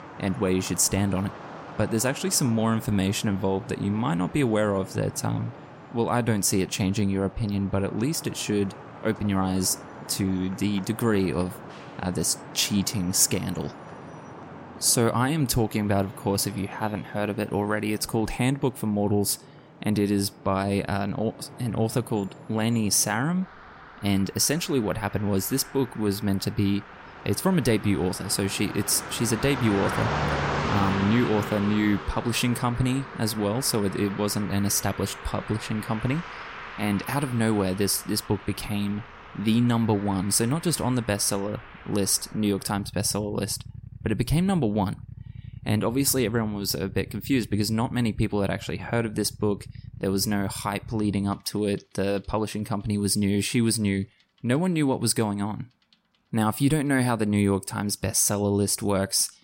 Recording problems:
traffic noise; noticeable; throughout; 15 dB below the speech

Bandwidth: 16 kHz